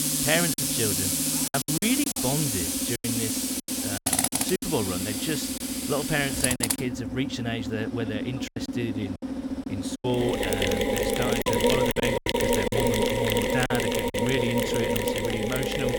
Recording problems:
machinery noise; very loud; throughout; 4 dB above the speech
choppy; very; 8% of the speech affected

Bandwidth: 17.5 kHz